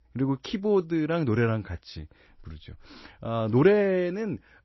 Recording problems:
garbled, watery; slightly; nothing above 6 kHz

